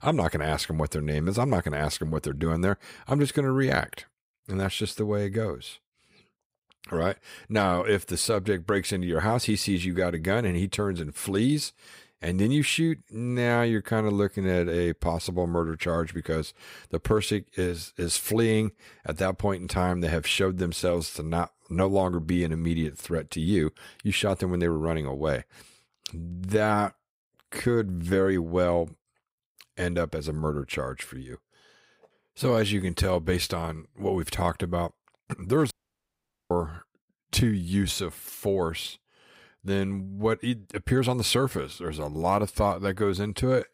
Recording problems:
audio cutting out; at 36 s for 1 s

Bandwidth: 15.5 kHz